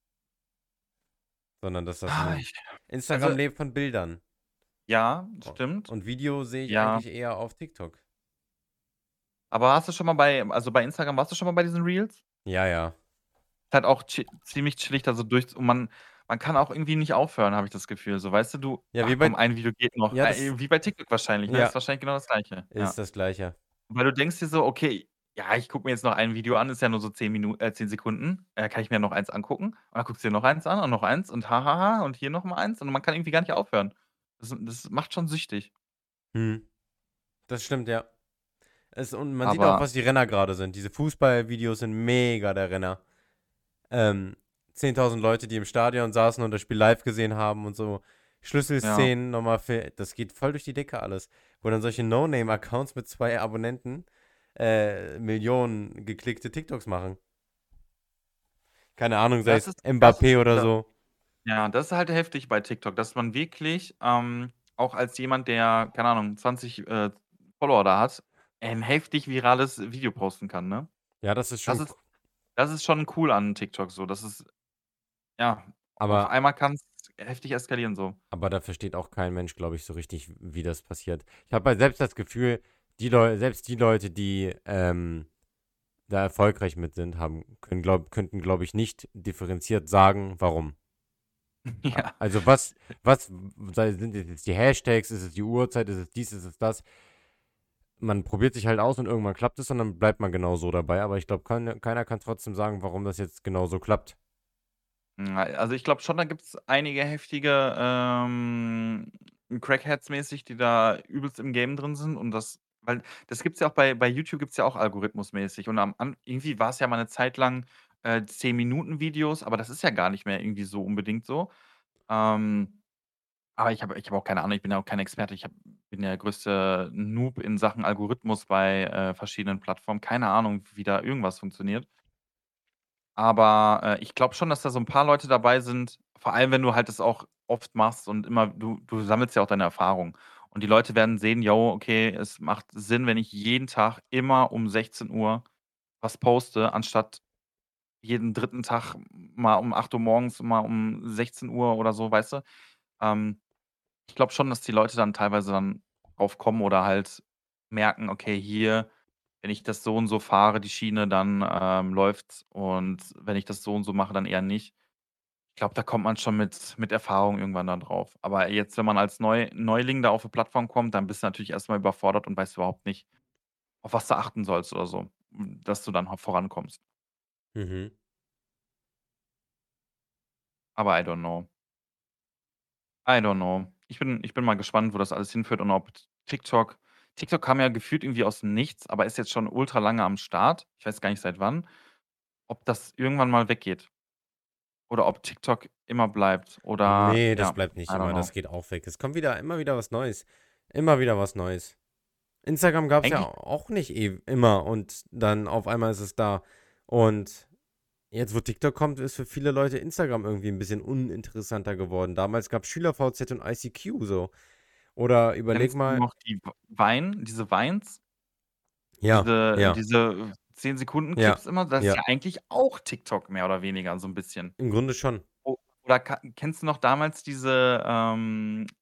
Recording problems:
none

